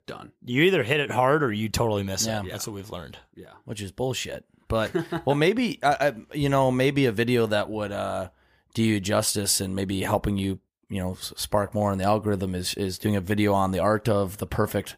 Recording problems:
none

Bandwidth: 15 kHz